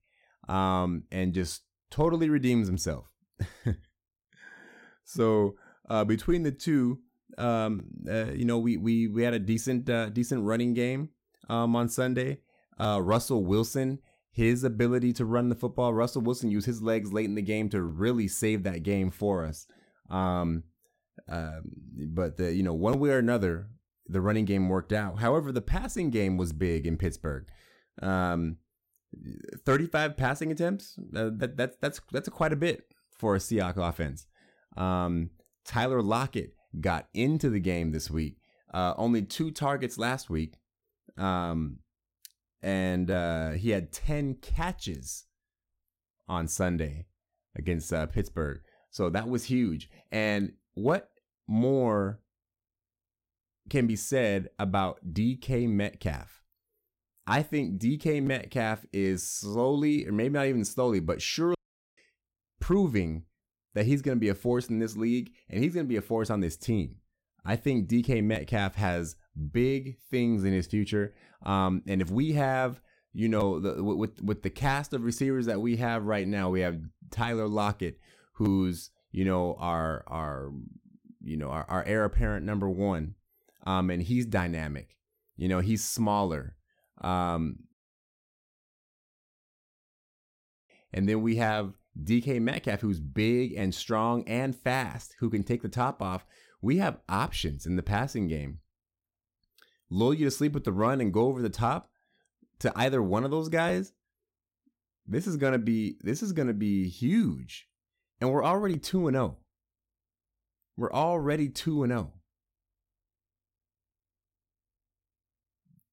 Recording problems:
audio cutting out; at 1:02 and at 1:28 for 3 s

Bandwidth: 16.5 kHz